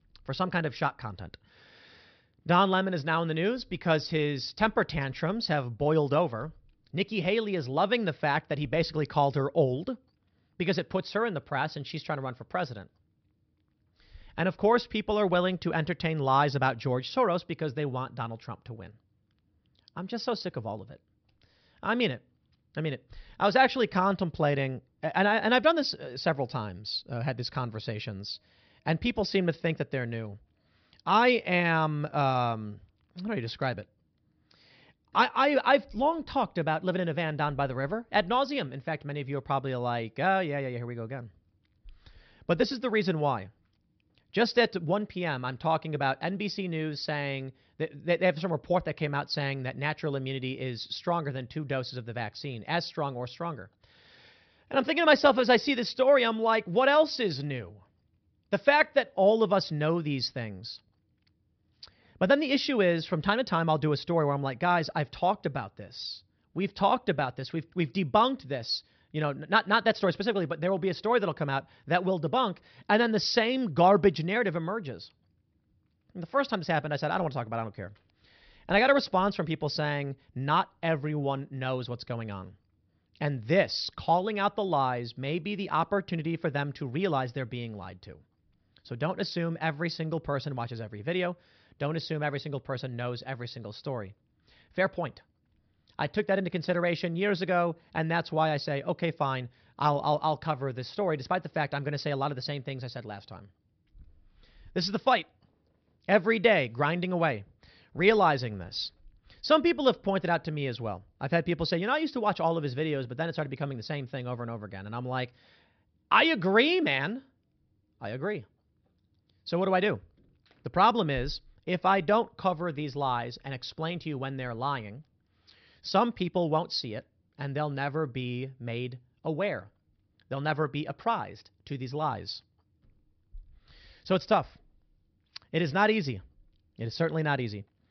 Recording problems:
high frequencies cut off; noticeable; nothing above 5.5 kHz

